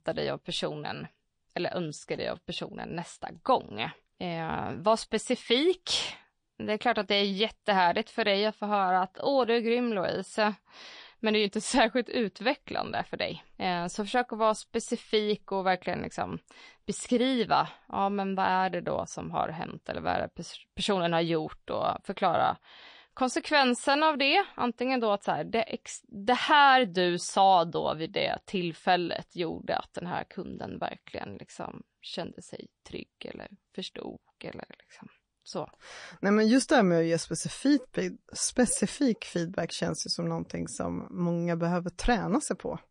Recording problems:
garbled, watery; slightly

